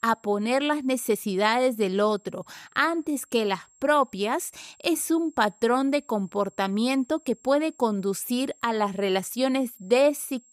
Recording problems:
high-pitched whine; faint; throughout; 7.5 kHz, 30 dB below the speech

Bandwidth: 15 kHz